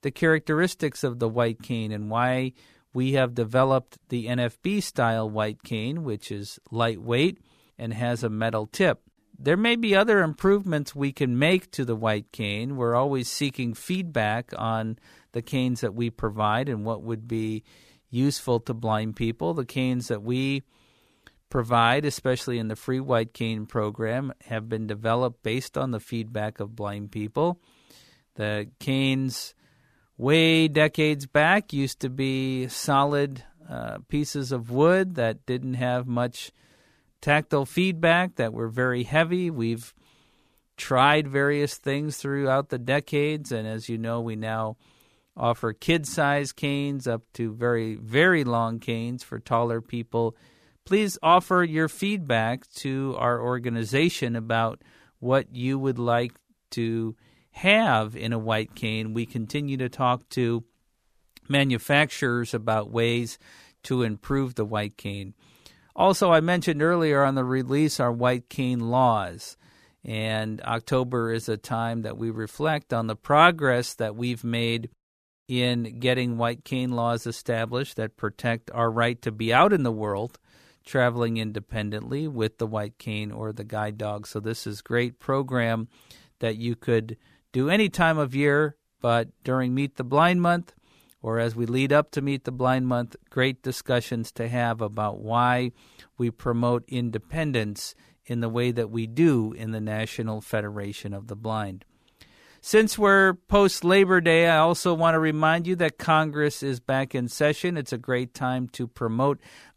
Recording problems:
none

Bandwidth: 14.5 kHz